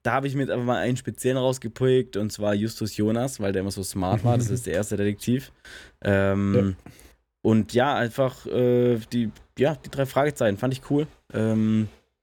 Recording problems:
none

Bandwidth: 18 kHz